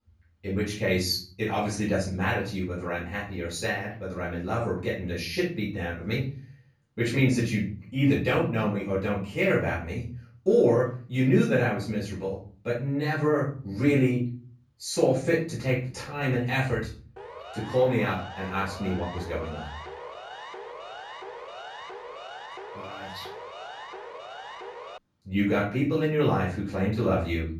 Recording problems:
off-mic speech; far
room echo; noticeable; dies away in 0.5 s
siren; faint; from 17 to 25 s; peak 15 dB below the speech

